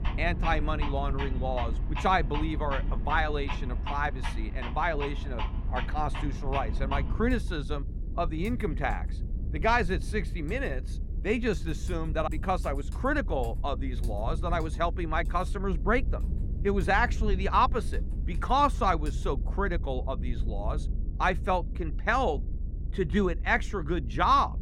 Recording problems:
muffled; slightly; fading above 3 kHz
household noises; noticeable; until 19 s; 15 dB below the speech
low rumble; faint; throughout; 20 dB below the speech

